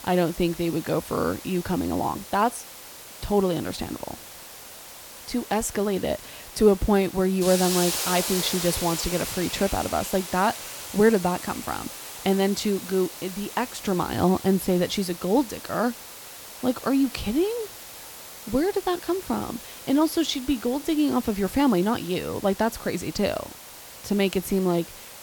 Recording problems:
hiss; loud; throughout; 10 dB below the speech

